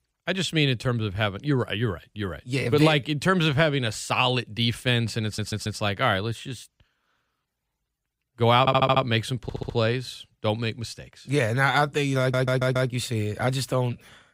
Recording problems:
audio stuttering; 4 times, first at 5.5 s

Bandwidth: 15.5 kHz